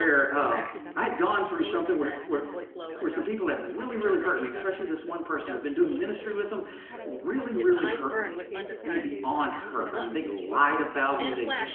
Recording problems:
room echo; slight; dies away in 0.9 s
phone-call audio
off-mic speech; somewhat distant
background chatter; loud; throughout; 3 voices, 9 dB below the speech
abrupt cut into speech; at the start

